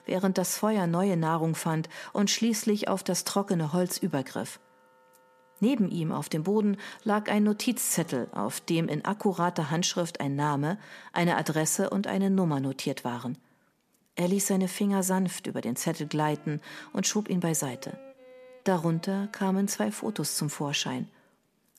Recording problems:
background music; faint; throughout; 30 dB below the speech

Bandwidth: 14.5 kHz